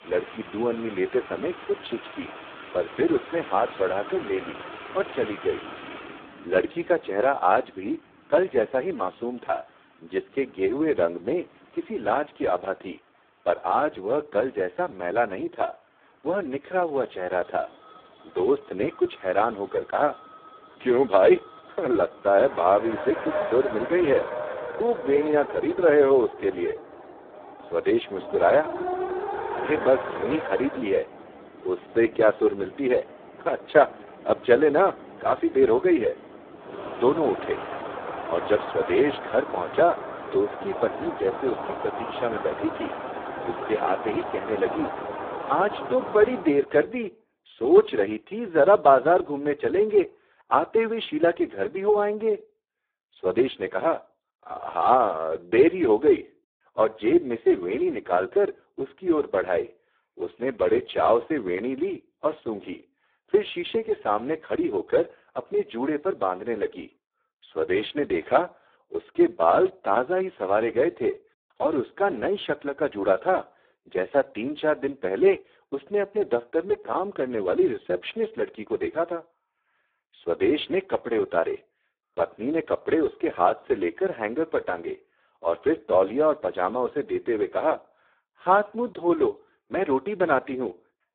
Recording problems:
phone-call audio; poor line; nothing above 3.5 kHz
traffic noise; noticeable; until 46 s; 10 dB below the speech

